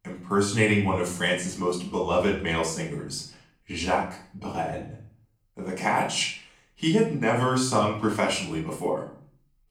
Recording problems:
off-mic speech; far
room echo; slight; dies away in 0.5 s

